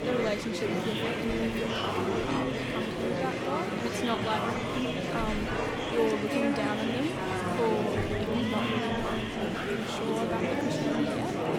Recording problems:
murmuring crowd; very loud; throughout; 4 dB above the speech

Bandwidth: 18 kHz